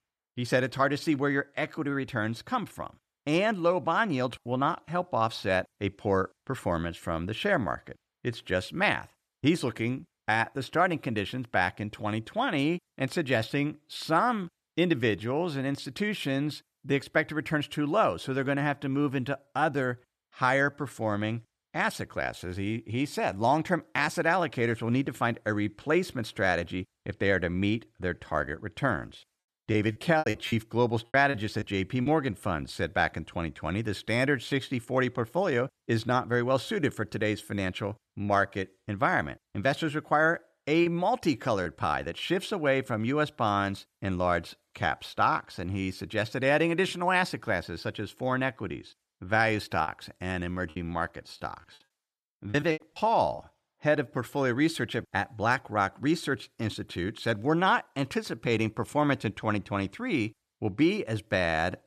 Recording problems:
choppy; very; from 30 to 32 s, at 41 s and from 50 to 53 s; 14% of the speech affected

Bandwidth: 14 kHz